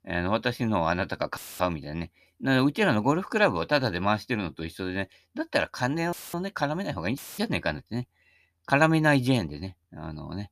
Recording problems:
audio cutting out; filled with static; at 1.5 s, at 6 s and at 7 s

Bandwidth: 14.5 kHz